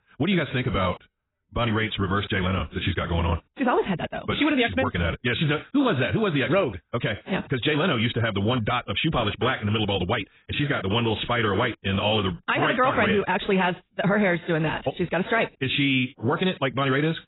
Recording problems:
garbled, watery; badly; nothing above 4 kHz
wrong speed, natural pitch; too fast; 1.6 times normal speed

